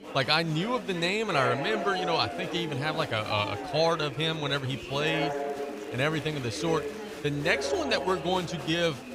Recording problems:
chatter from many people; loud; throughout; 7 dB below the speech

